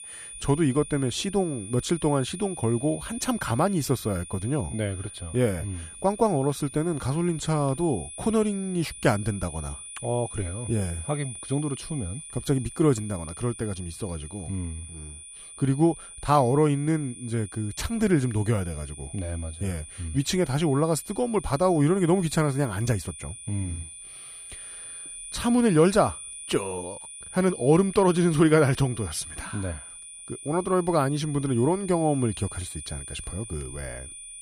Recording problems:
high-pitched whine; noticeable; throughout; 9.5 kHz, 15 dB below the speech

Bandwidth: 15 kHz